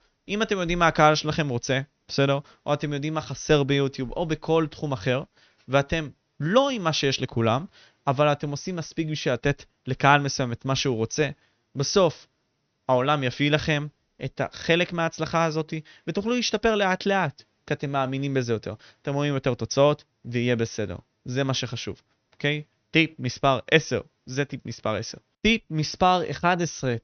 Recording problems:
high frequencies cut off; noticeable; nothing above 6 kHz

